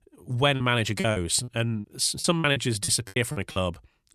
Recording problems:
choppy; very; 15% of the speech affected

